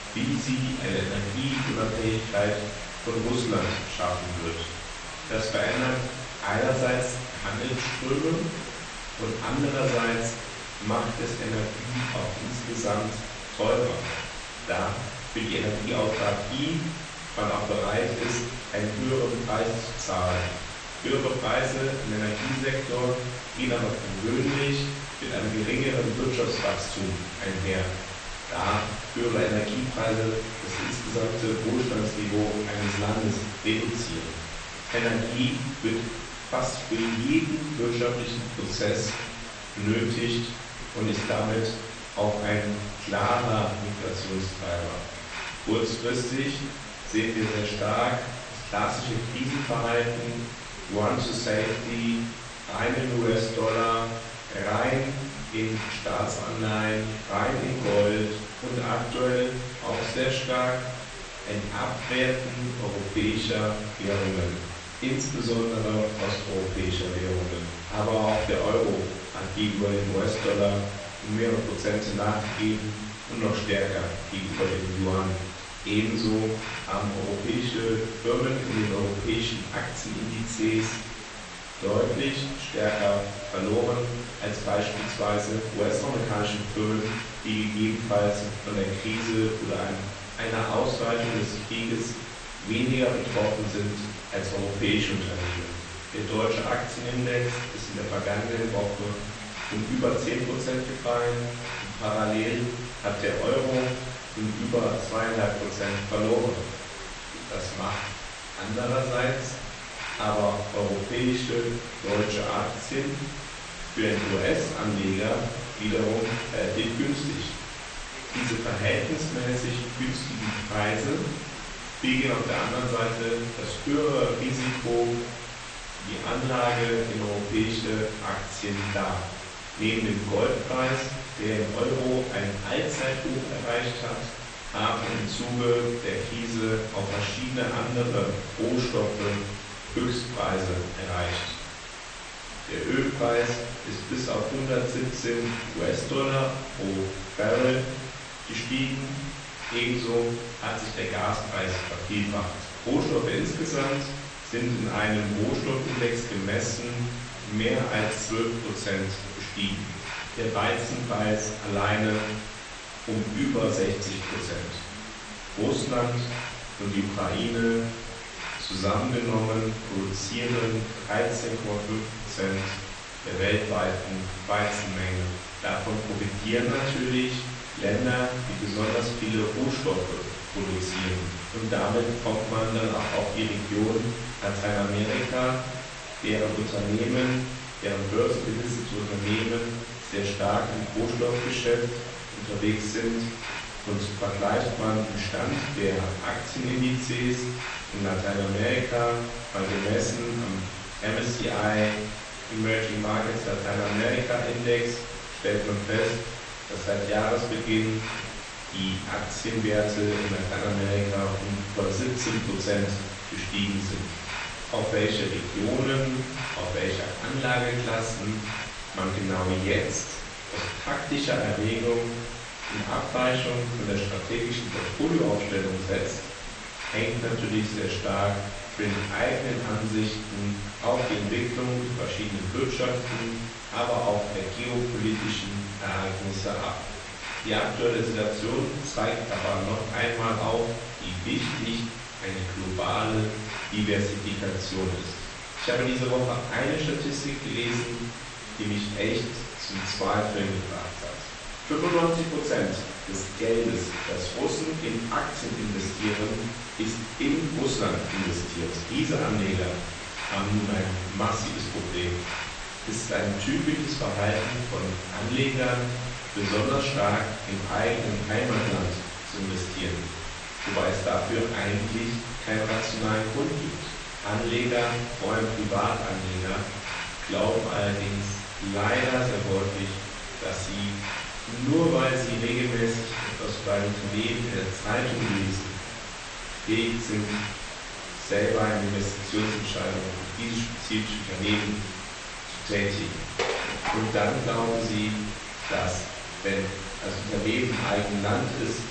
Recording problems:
off-mic speech; far
room echo; noticeable; dies away in 0.7 s
echo of what is said; faint; throughout; 110 ms later, 25 dB below the speech
garbled, watery; slightly; nothing above 8.5 kHz
hiss; loud; throughout; 8 dB below the speech
background chatter; faint; throughout; 2 voices, 25 dB below the speech
clattering dishes; noticeable; at 4:53; peak level with the speech

